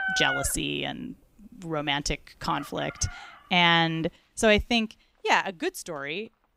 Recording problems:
animal sounds; loud; throughout; 8 dB below the speech

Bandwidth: 15.5 kHz